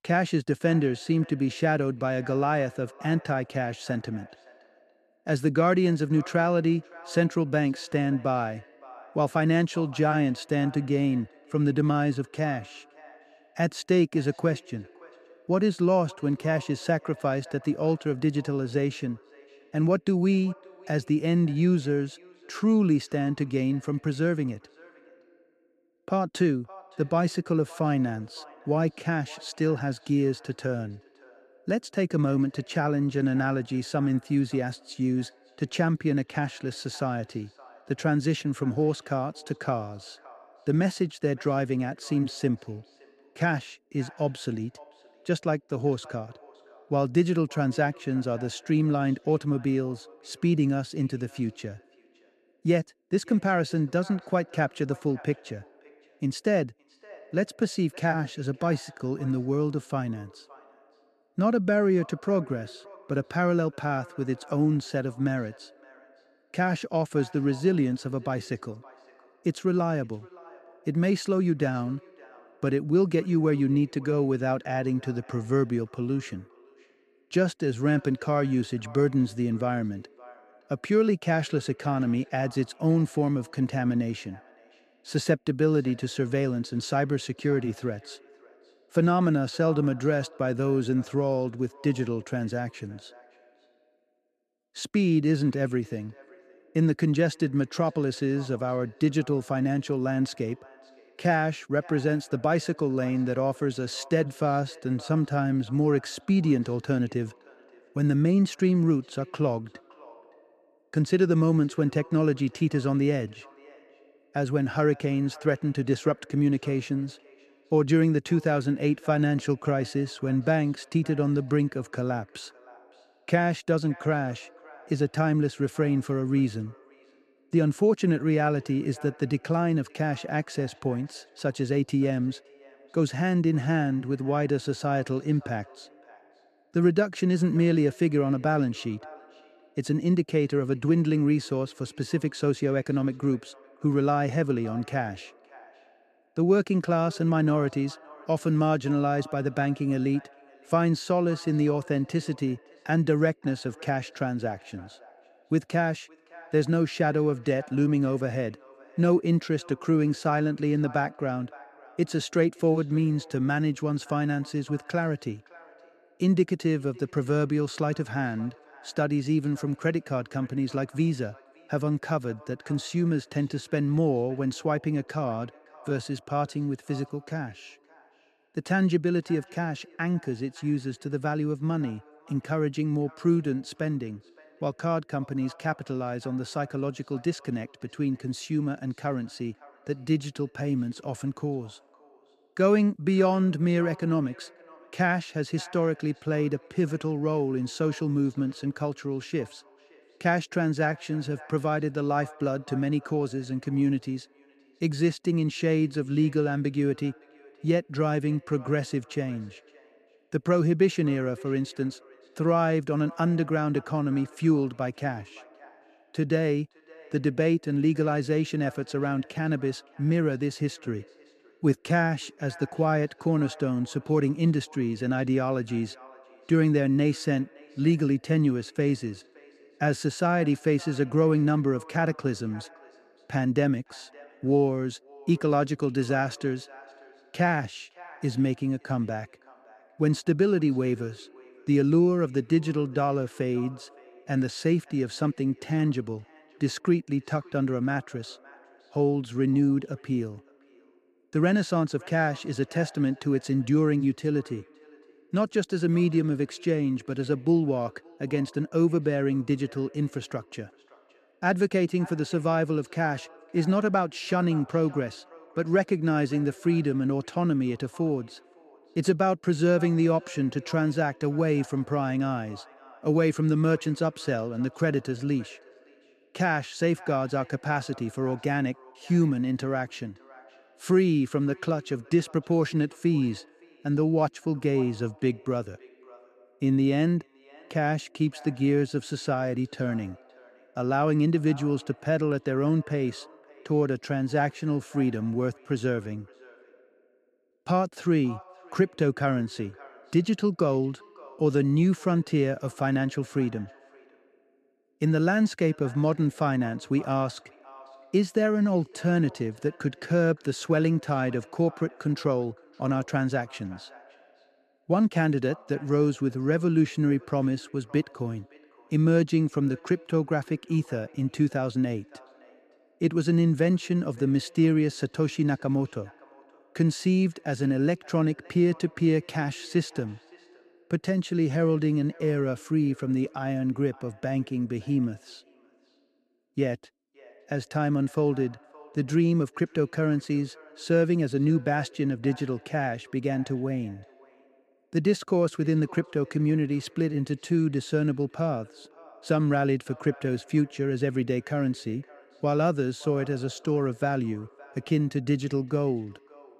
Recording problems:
echo of what is said; faint; throughout; 570 ms later, 25 dB below the speech

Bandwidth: 13.5 kHz